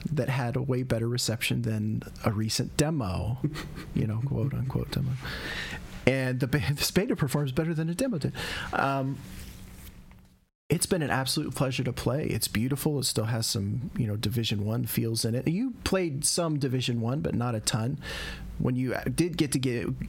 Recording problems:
squashed, flat; heavily

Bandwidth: 16.5 kHz